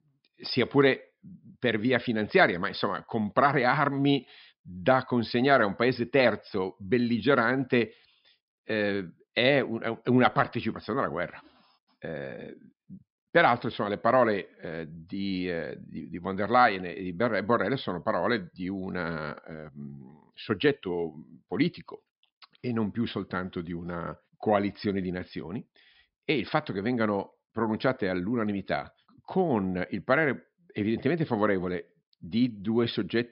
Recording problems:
high frequencies cut off; noticeable; nothing above 5.5 kHz

